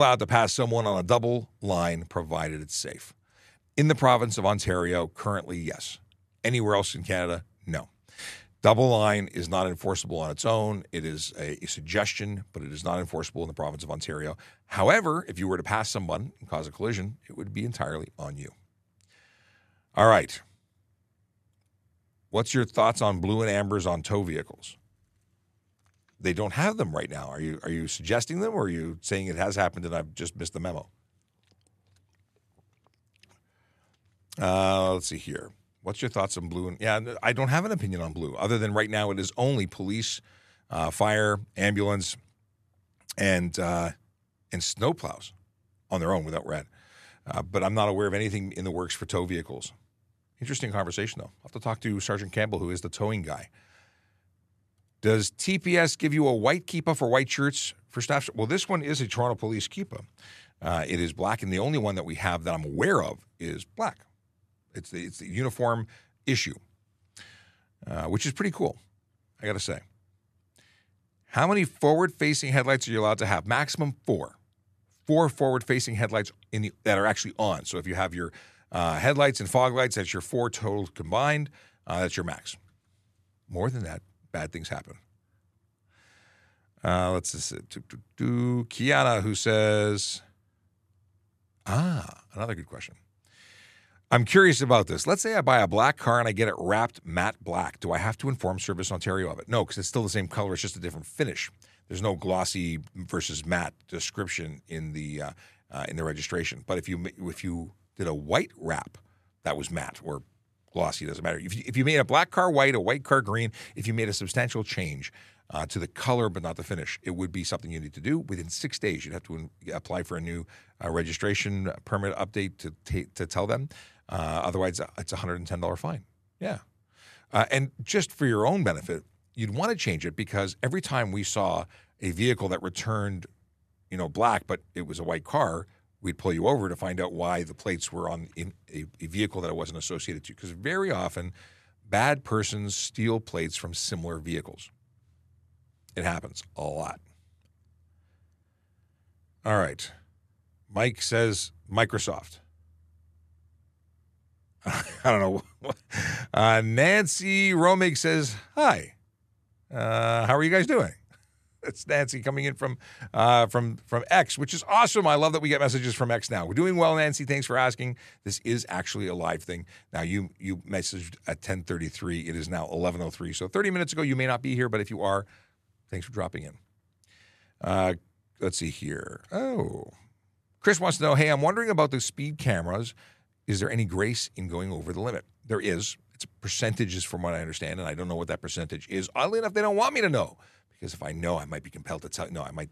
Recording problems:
abrupt cut into speech; at the start

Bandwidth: 14 kHz